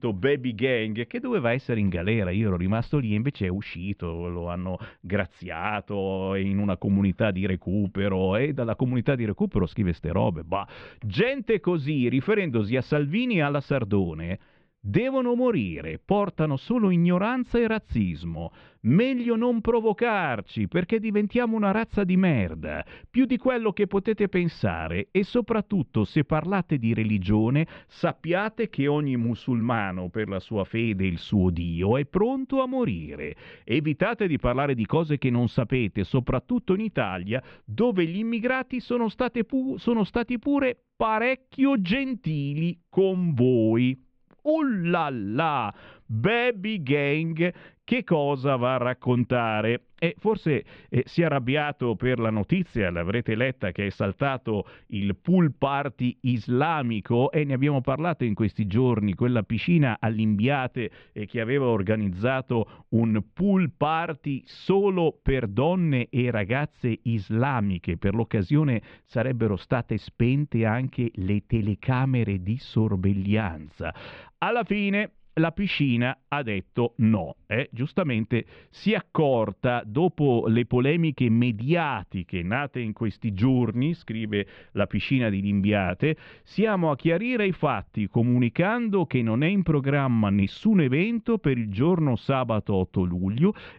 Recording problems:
muffled; very; fading above 3 kHz

